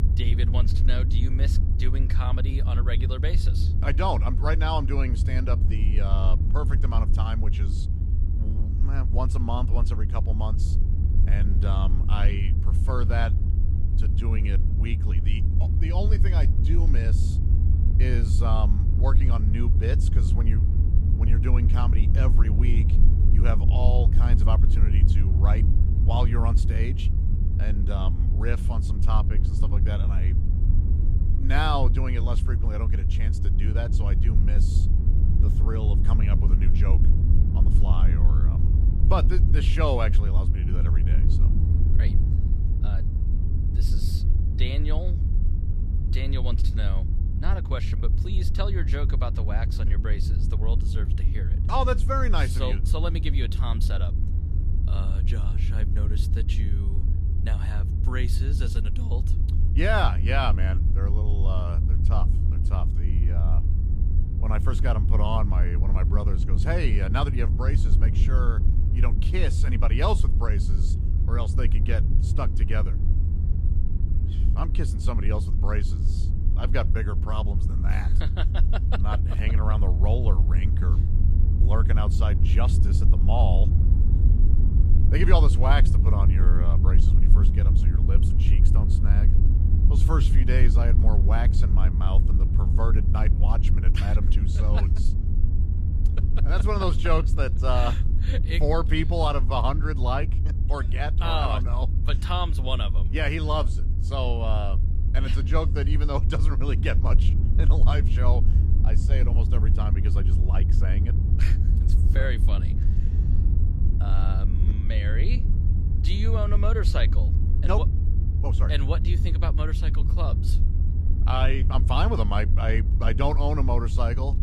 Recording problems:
low rumble; loud; throughout; 7 dB below the speech

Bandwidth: 15 kHz